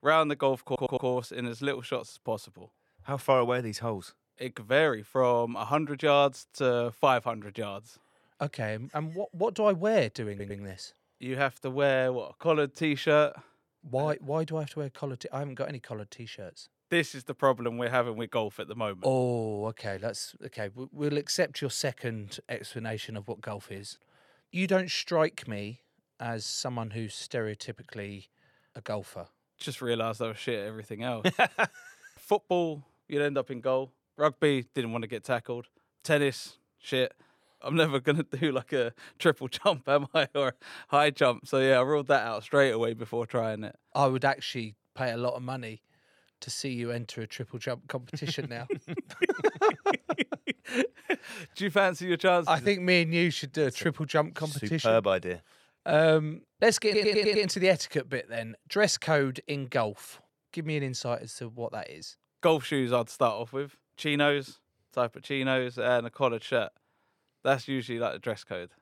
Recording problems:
audio stuttering; at 0.5 s, at 10 s and at 57 s

